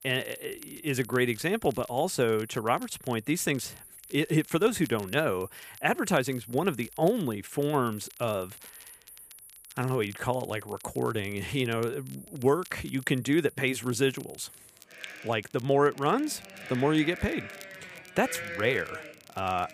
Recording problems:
animal sounds; noticeable; throughout; 15 dB below the speech
crackle, like an old record; faint; 25 dB below the speech

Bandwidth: 15 kHz